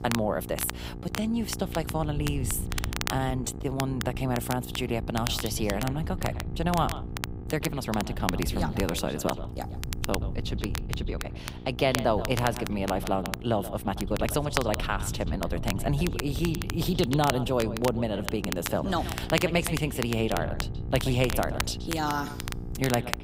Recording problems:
echo of what is said; noticeable; from 5 s on; 130 ms later, 15 dB below the speech
crackle, like an old record; loud; 8 dB below the speech
electrical hum; noticeable; throughout; 60 Hz, 15 dB below the speech
wind noise on the microphone; occasional gusts; 20 dB below the speech
uneven, jittery; strongly; from 1 to 15 s

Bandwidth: 15.5 kHz